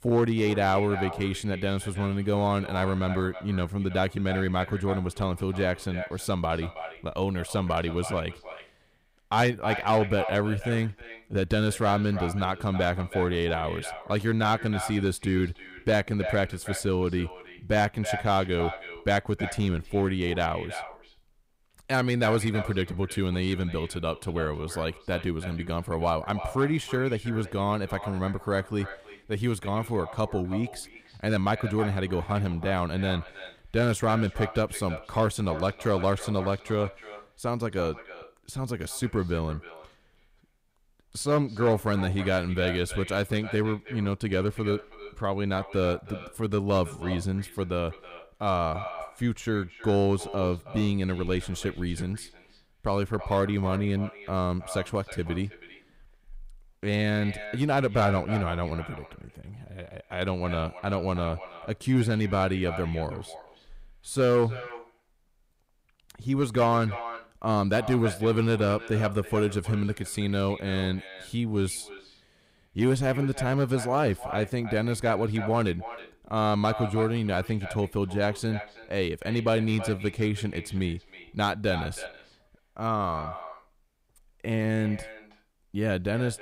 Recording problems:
echo of what is said; noticeable; throughout; 320 ms later, 15 dB below the speech

